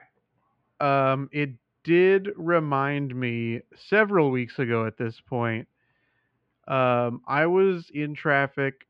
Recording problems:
muffled; very; fading above 3 kHz

